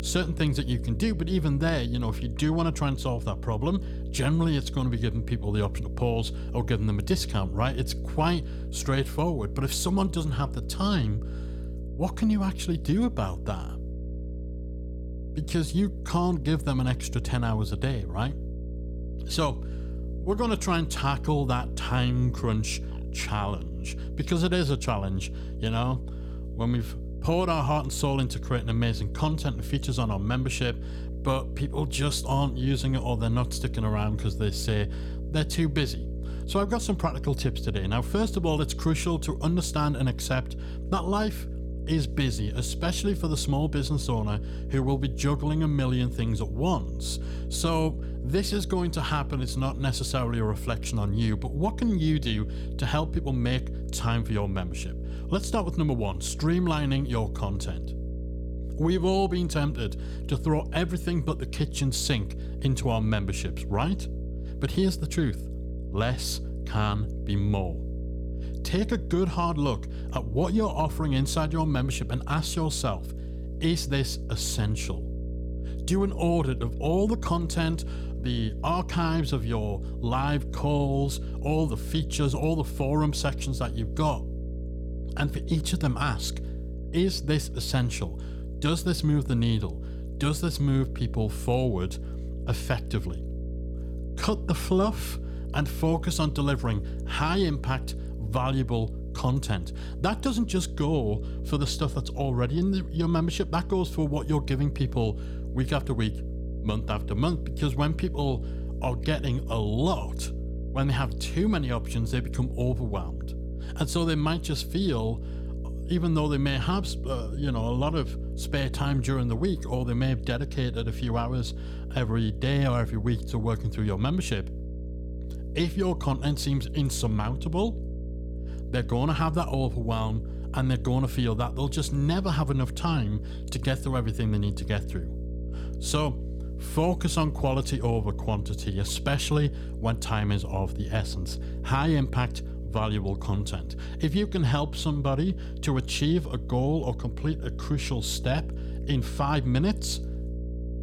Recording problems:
electrical hum; noticeable; throughout; 60 Hz, 15 dB below the speech

